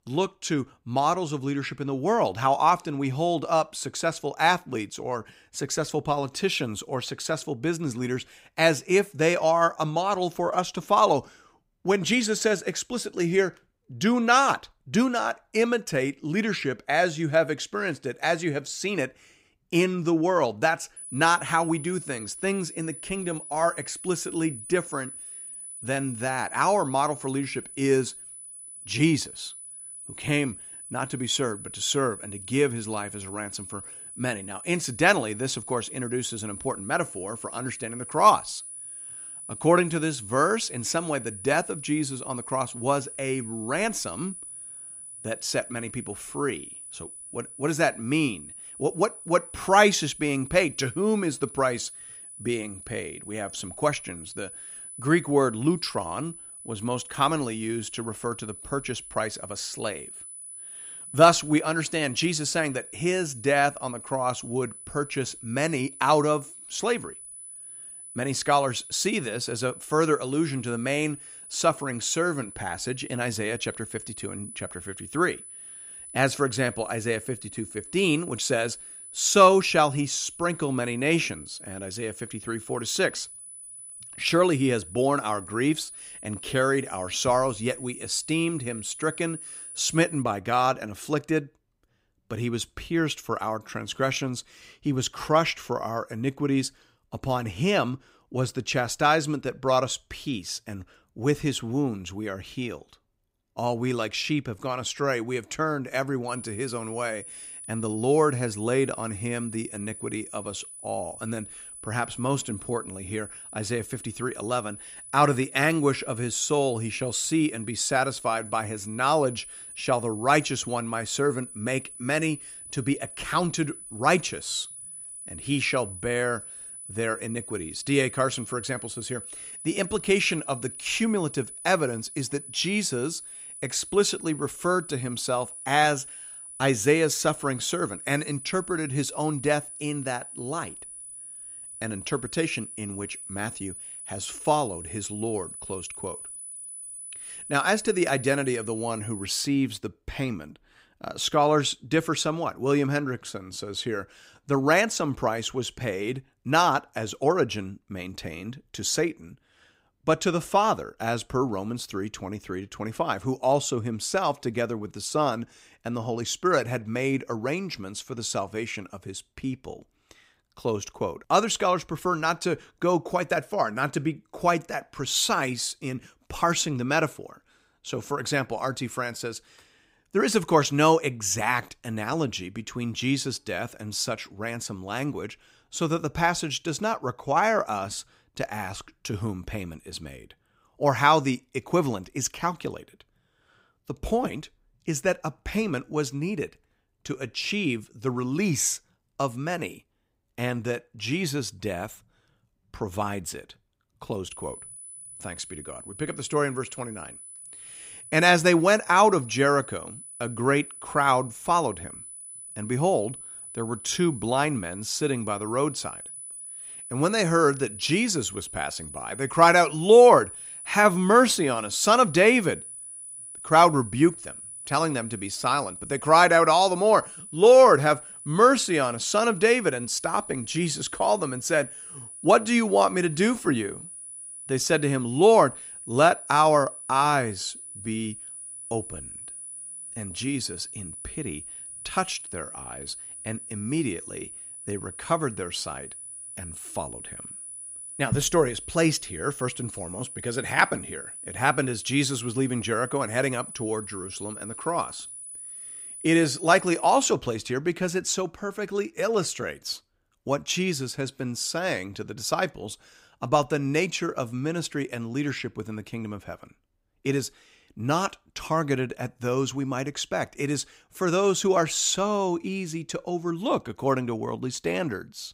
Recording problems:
high-pitched whine; noticeable; from 21 s to 1:30, from 1:46 to 2:29 and from 3:24 to 4:17; 10 kHz, 10 dB below the speech

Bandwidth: 15.5 kHz